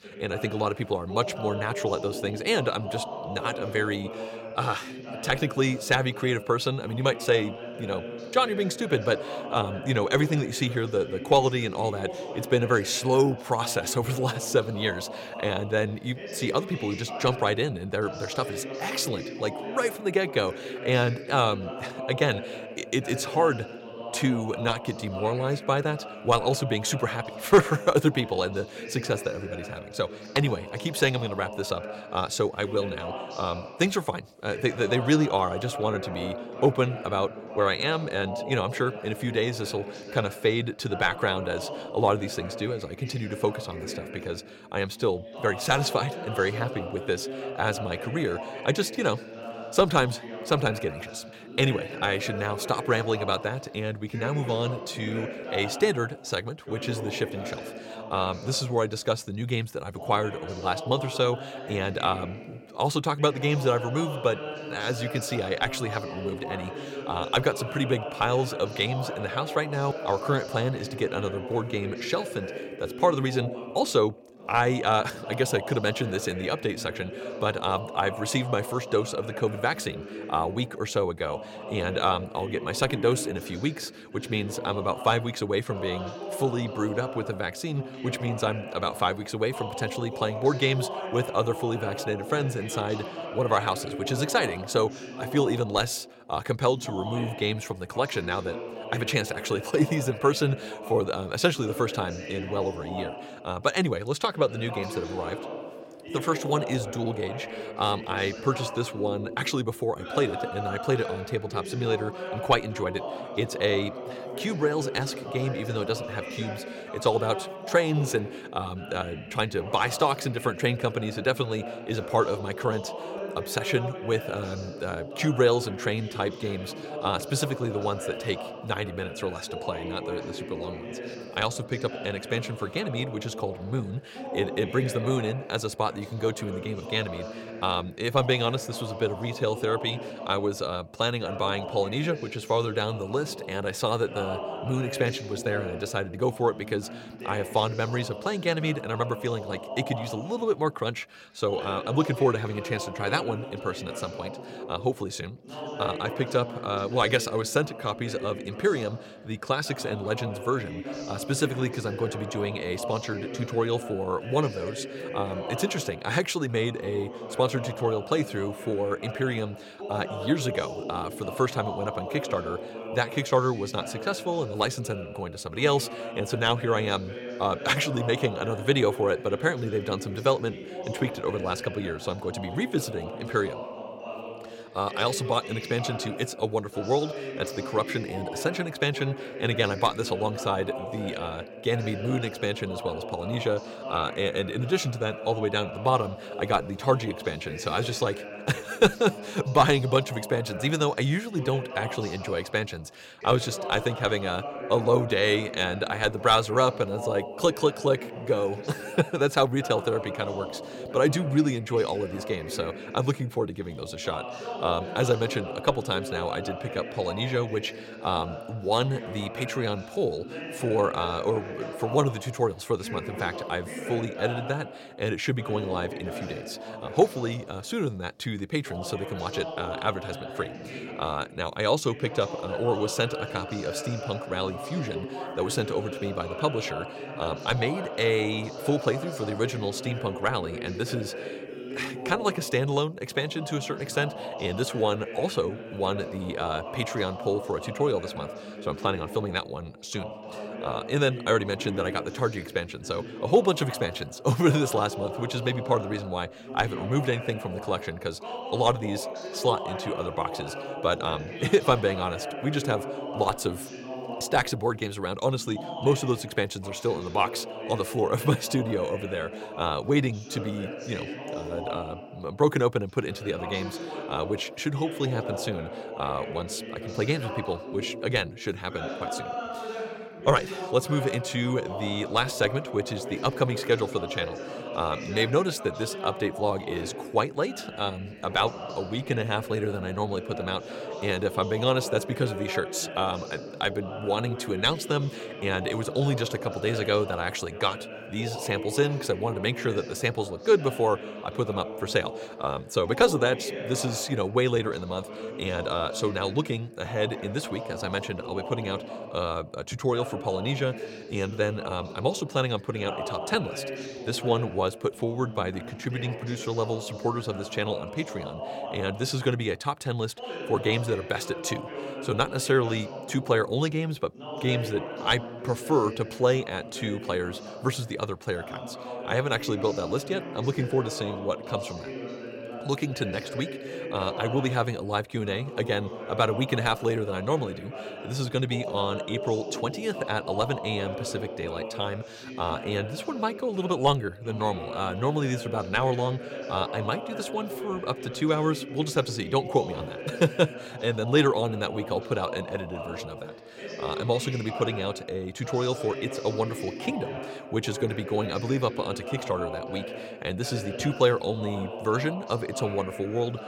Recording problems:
voice in the background; loud; throughout; 9 dB below the speech

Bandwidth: 16.5 kHz